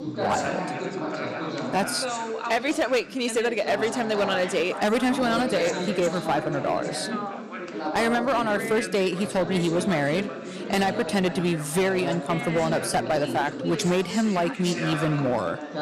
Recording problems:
distortion; slight; 7% of the sound clipped
background chatter; loud; throughout; 4 voices, 6 dB below the speech

